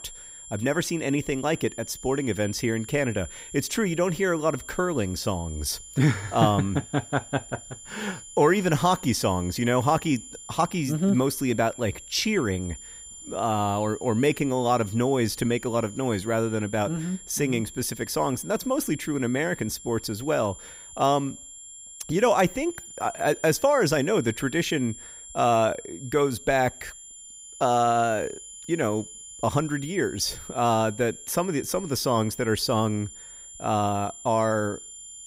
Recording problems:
high-pitched whine; noticeable; throughout; 7 kHz, 15 dB below the speech

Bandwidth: 15.5 kHz